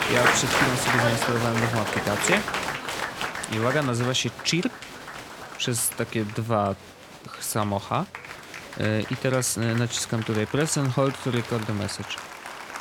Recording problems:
crowd noise; loud; throughout; 3 dB below the speech

